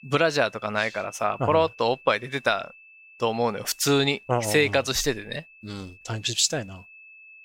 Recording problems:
high-pitched whine; faint; throughout; 2.5 kHz, 25 dB below the speech

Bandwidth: 16 kHz